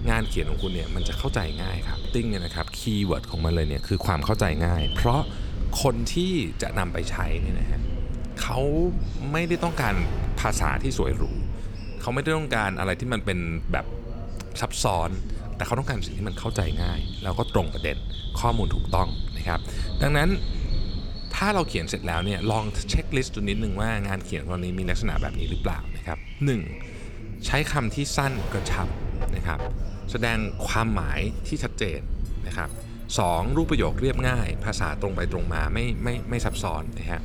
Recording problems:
animal sounds; noticeable; throughout; 15 dB below the speech
voice in the background; noticeable; throughout; 15 dB below the speech
train or aircraft noise; faint; throughout; 25 dB below the speech
low rumble; faint; throughout; 20 dB below the speech

